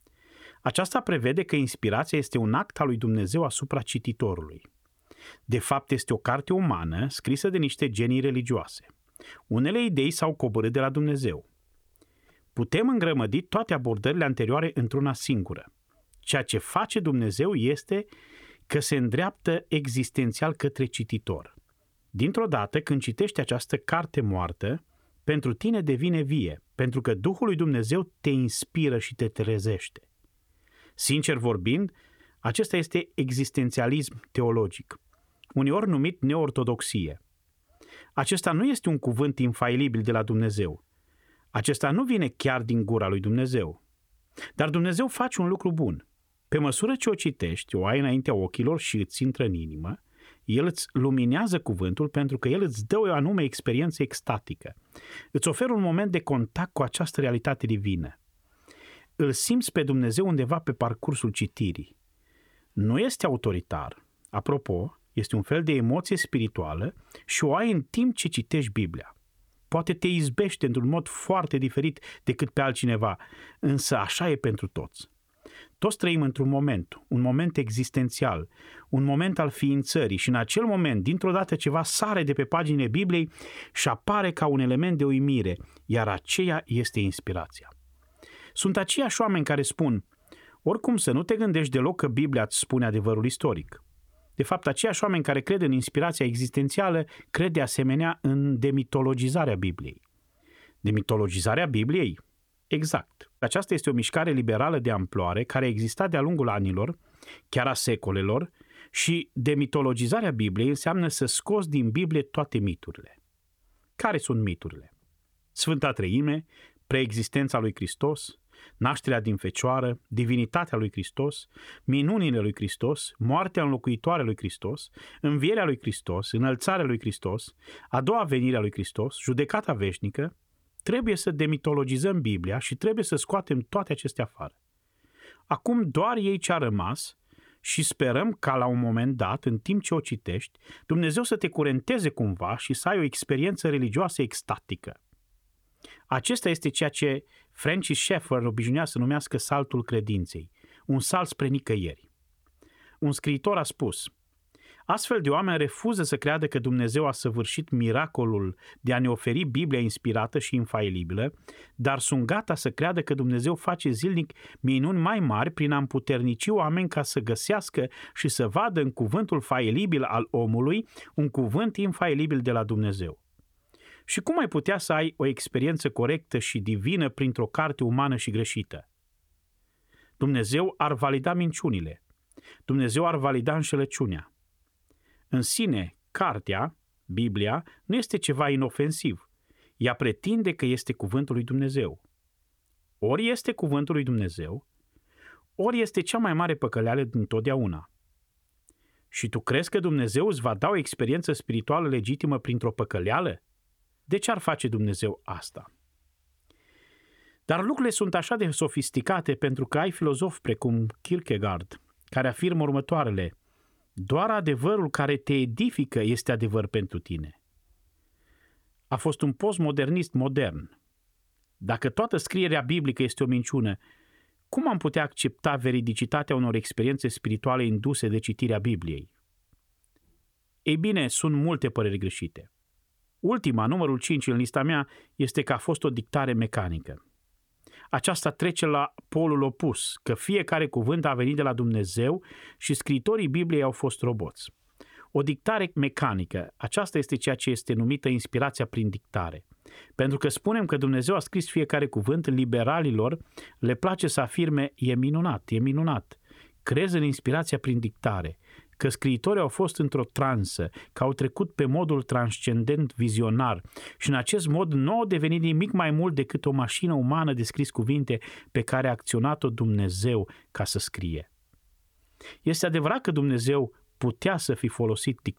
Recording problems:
none

